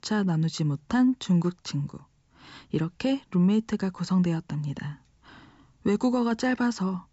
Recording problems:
high frequencies cut off; noticeable; nothing above 8 kHz

